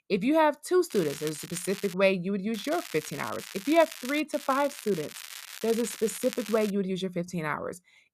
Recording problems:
crackling; noticeable; from 1 to 2 s, from 2.5 to 4 s and from 4.5 to 6.5 s; 15 dB below the speech

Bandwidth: 14.5 kHz